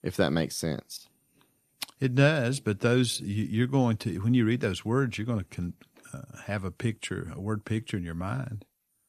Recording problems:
none

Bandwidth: 14.5 kHz